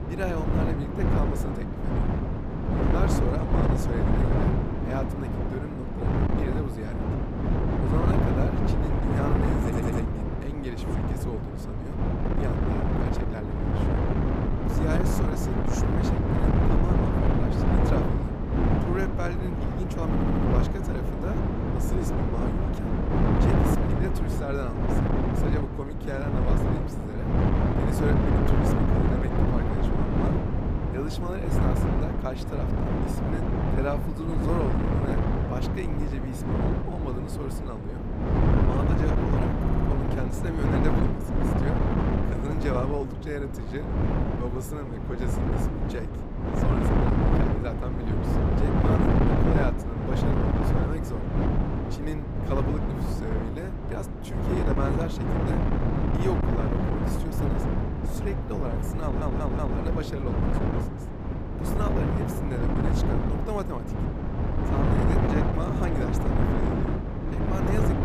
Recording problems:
wind noise on the microphone; heavy; 4 dB above the speech
audio stuttering; 4 times, first at 9.5 s

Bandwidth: 15 kHz